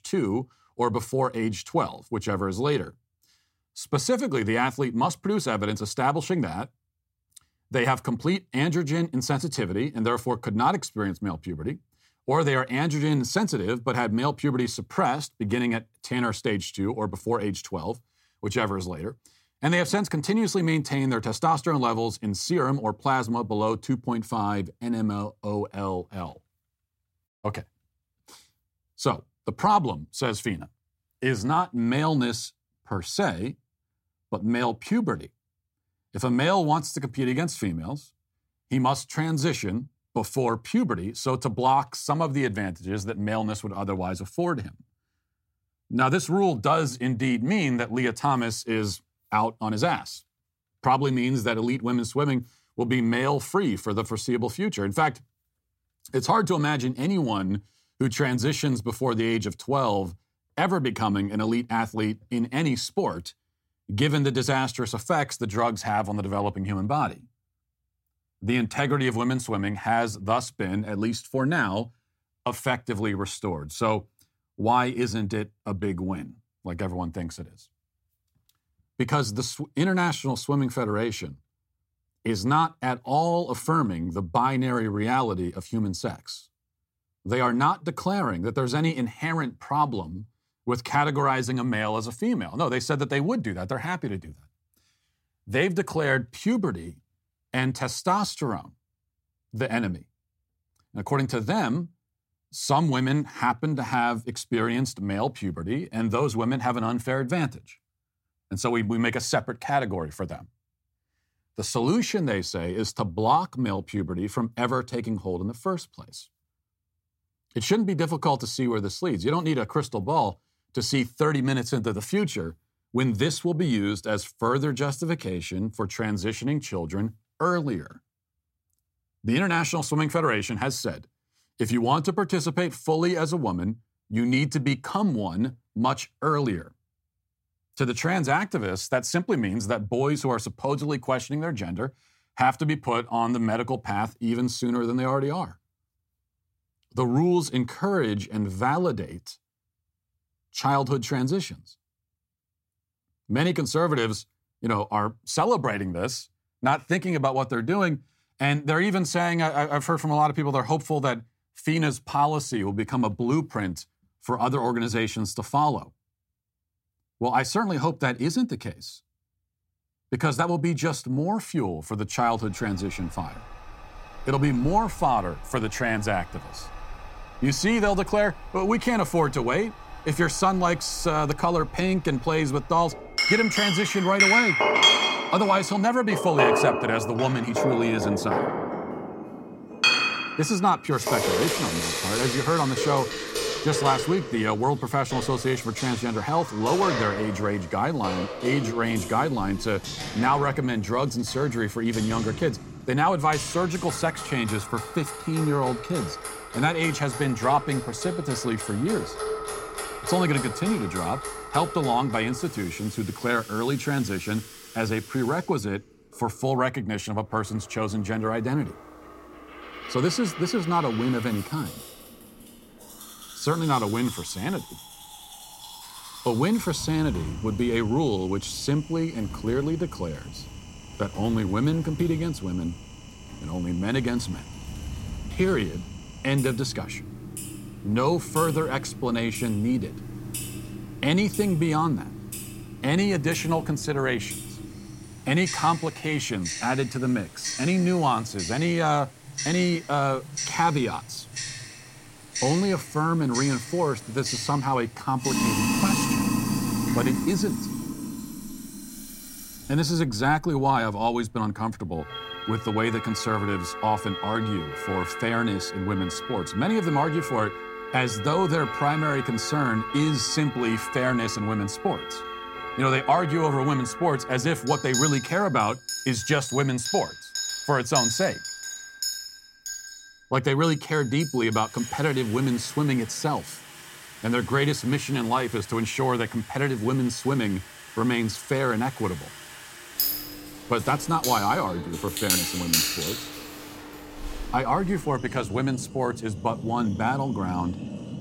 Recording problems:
household noises; loud; from 2:52 on; 5 dB below the speech

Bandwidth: 16 kHz